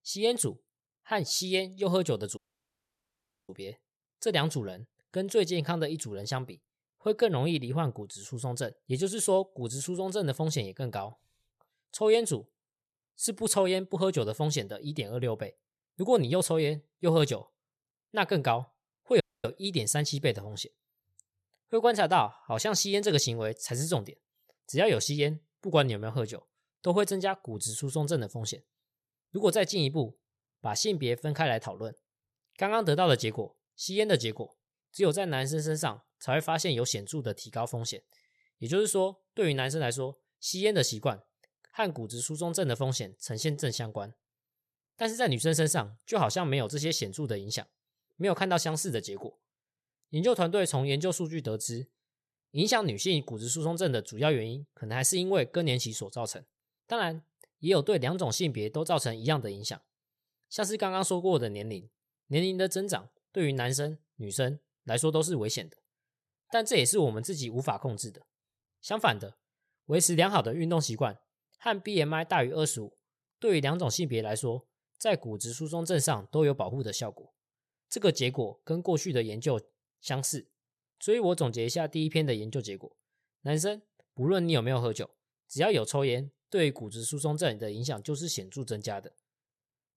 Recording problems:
audio cutting out; at 2.5 s for 1 s and at 19 s

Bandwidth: 13.5 kHz